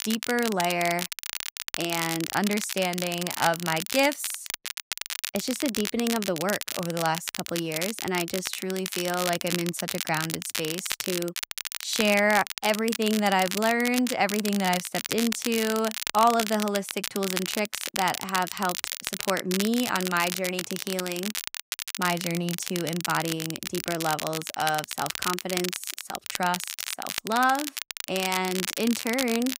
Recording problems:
crackle, like an old record; loud; 4 dB below the speech

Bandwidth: 15.5 kHz